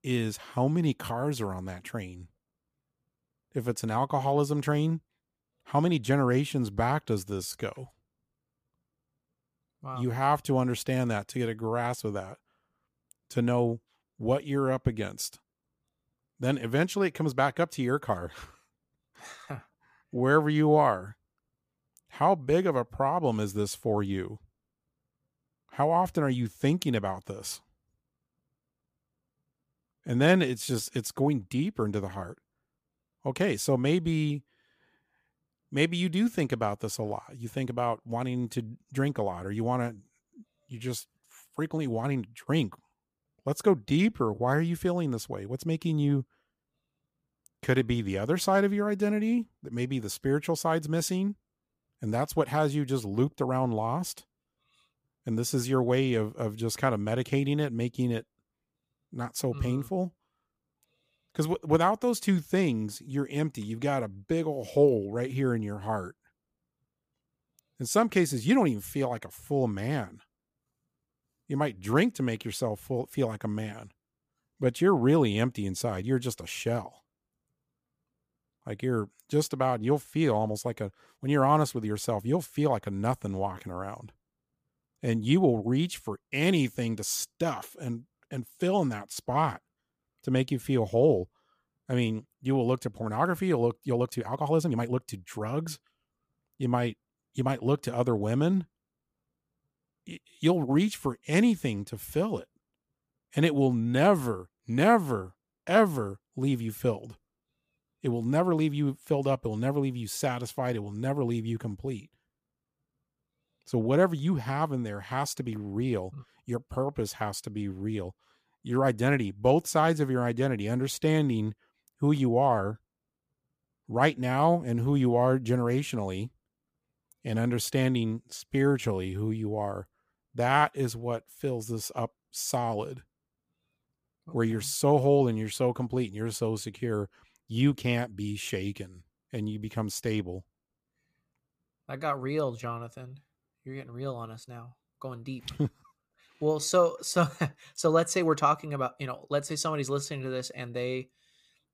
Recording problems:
uneven, jittery; strongly; from 5.5 s to 2:27

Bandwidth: 15 kHz